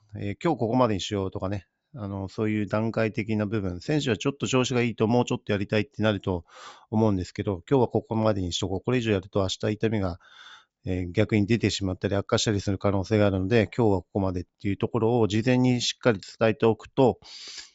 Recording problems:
high frequencies cut off; noticeable; nothing above 8 kHz

